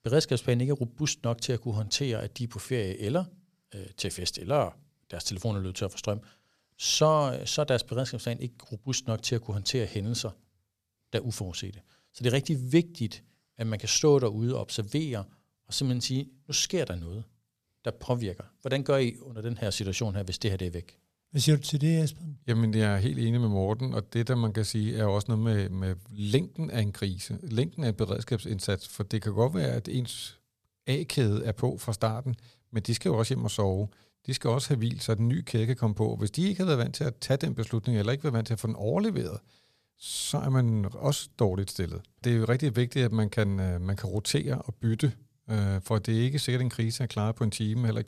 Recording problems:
none

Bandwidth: 14.5 kHz